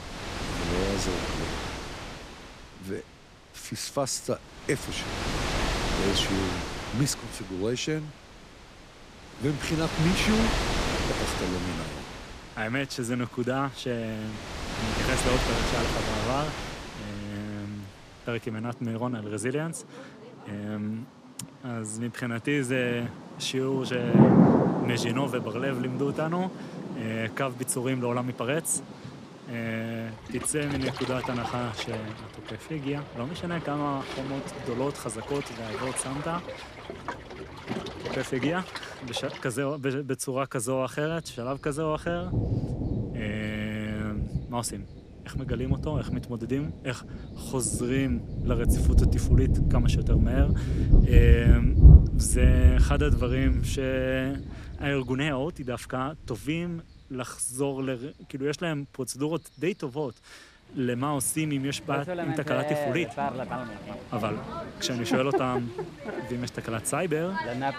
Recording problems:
rain or running water; very loud; throughout; 3 dB above the speech

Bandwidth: 14.5 kHz